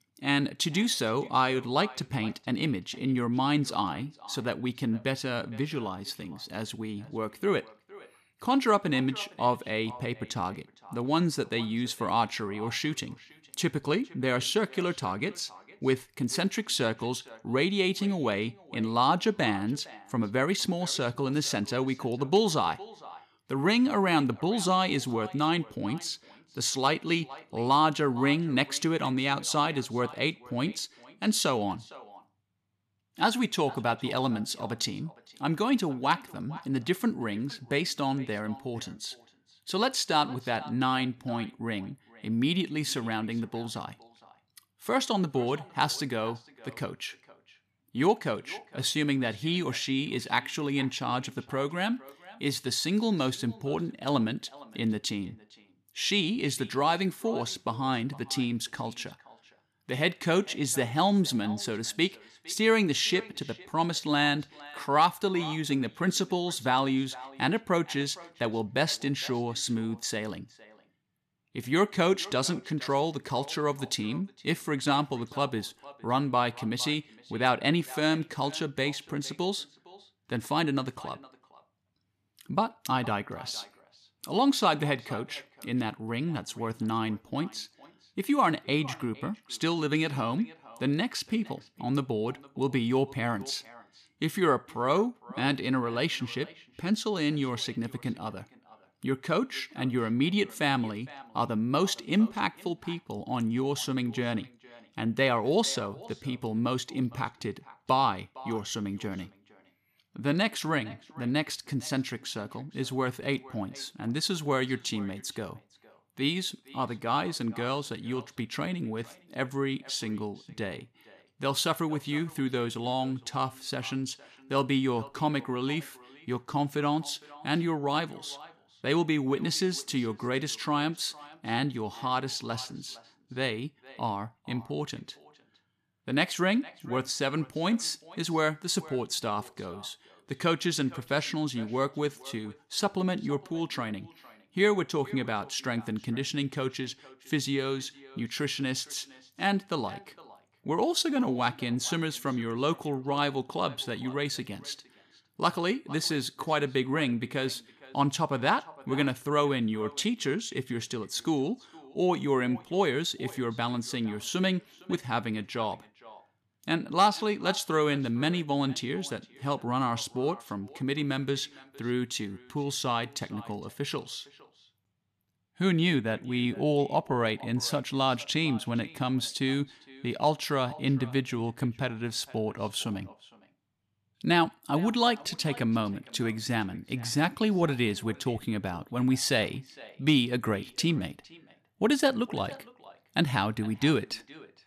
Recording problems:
echo of what is said; faint; throughout; 460 ms later, 20 dB below the speech

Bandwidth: 14.5 kHz